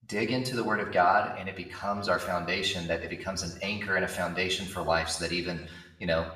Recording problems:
off-mic speech; far
room echo; slight; dies away in 0.7 s

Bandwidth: 15 kHz